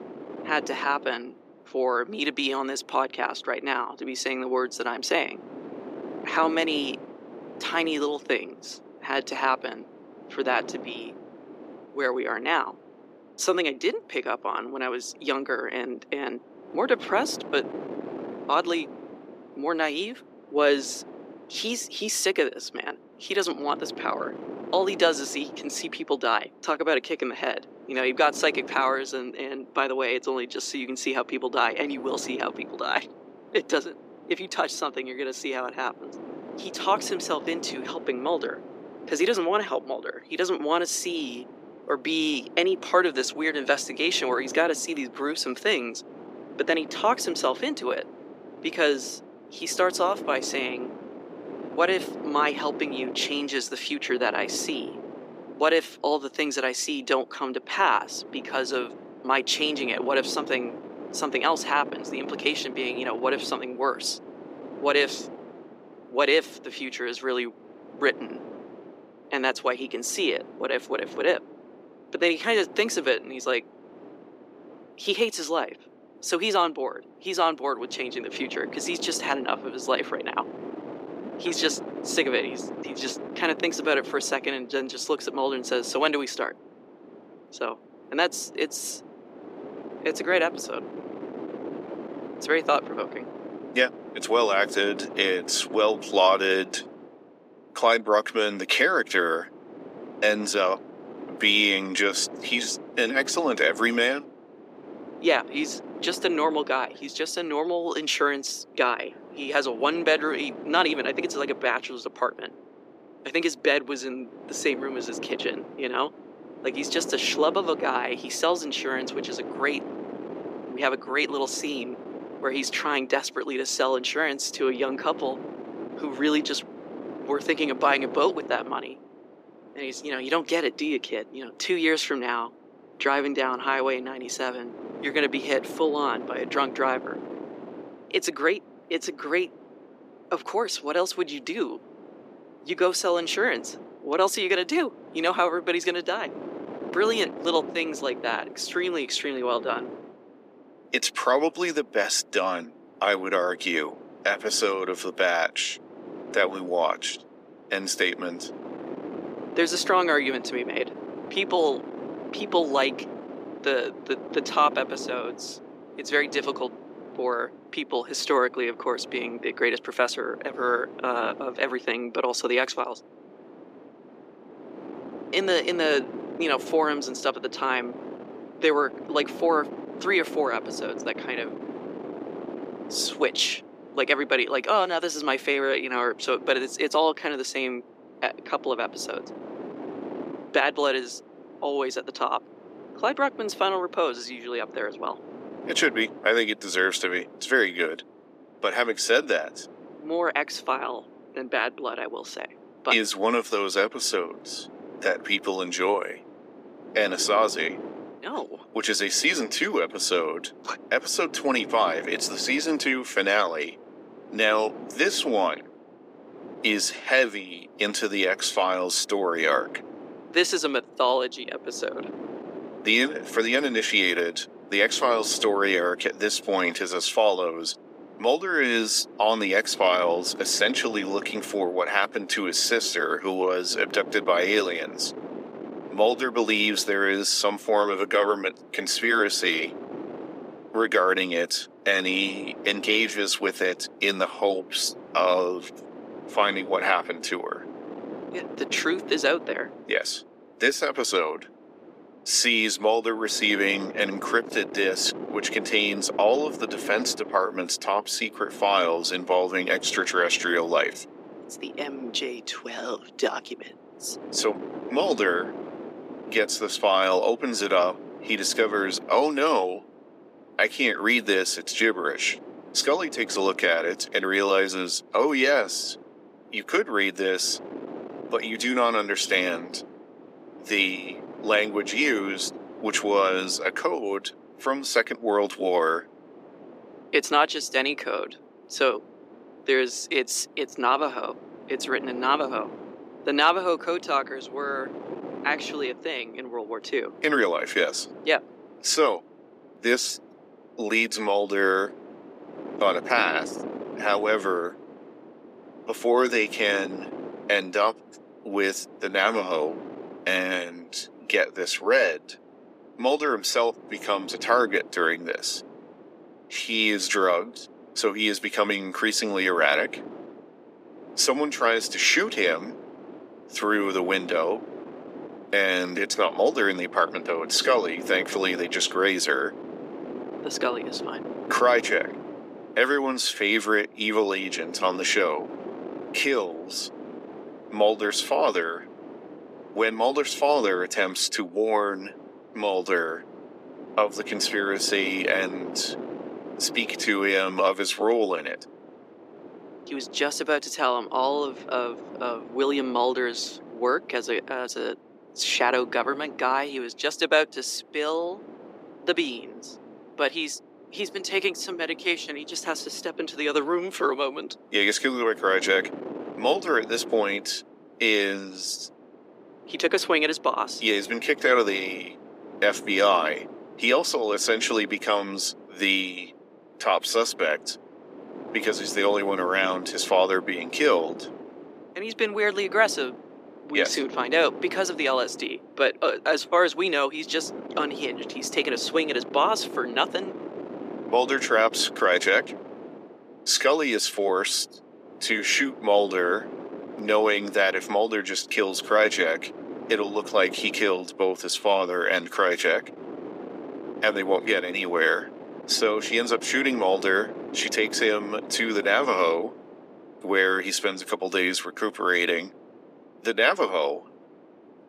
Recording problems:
thin; somewhat; fading below 300 Hz
wind noise on the microphone; occasional gusts; 20 dB below the speech

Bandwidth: 15 kHz